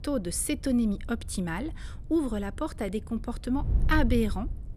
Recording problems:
wind noise on the microphone; occasional gusts; 20 dB below the speech

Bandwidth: 14 kHz